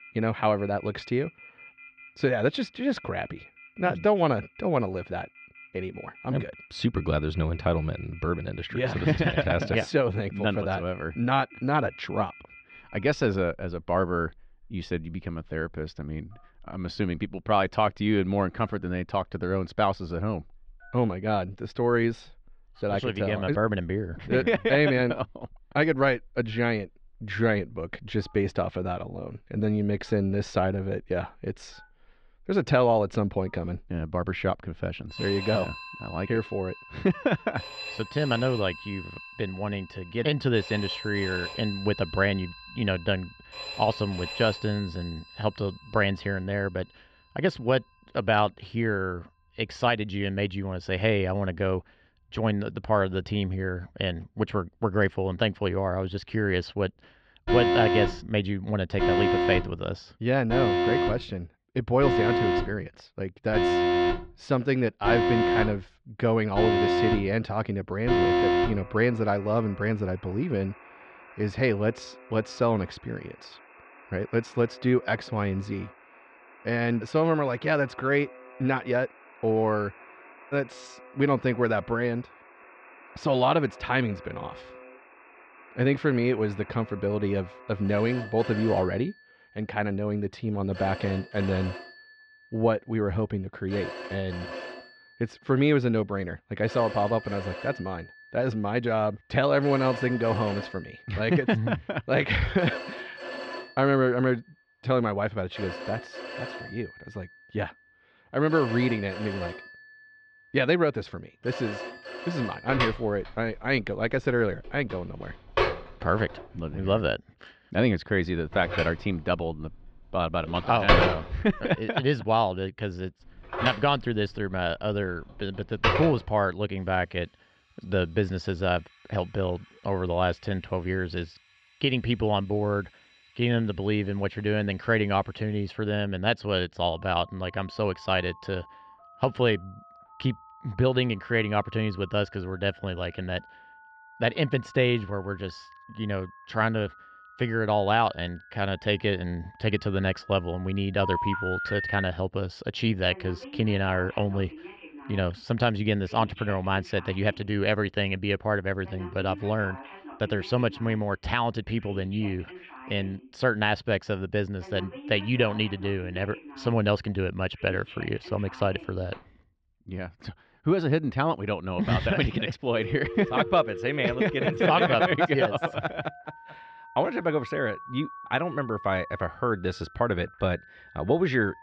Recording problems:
muffled; slightly; fading above 4 kHz
alarms or sirens; loud; throughout; 5 dB below the speech

